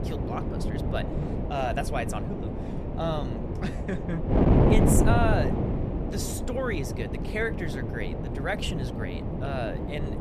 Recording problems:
wind noise on the microphone; heavy; 1 dB below the speech

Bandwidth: 14.5 kHz